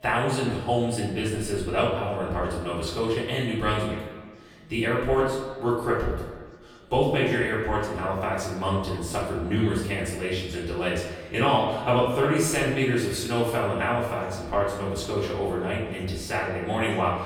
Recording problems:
echo of what is said; strong; throughout; 120 ms later, 10 dB below the speech
off-mic speech; far
room echo; noticeable; dies away in 0.6 s
background chatter; faint; throughout; 3 voices, 30 dB below the speech

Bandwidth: 18.5 kHz